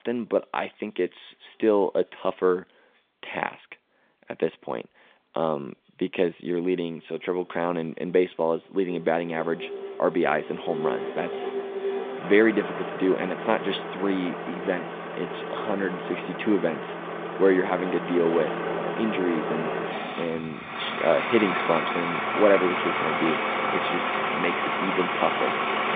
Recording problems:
phone-call audio; nothing above 3.5 kHz
traffic noise; loud; throughout; 2 dB below the speech

